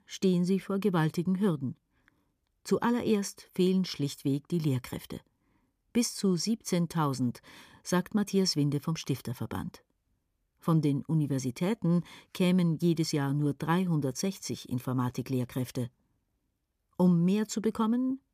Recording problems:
none

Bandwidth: 15 kHz